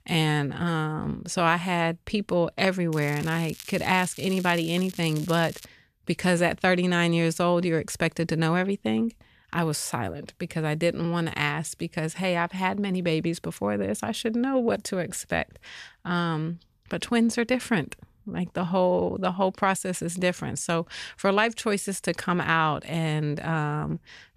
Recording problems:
crackling; noticeable; from 3 to 5.5 s; 15 dB below the speech

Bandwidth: 14.5 kHz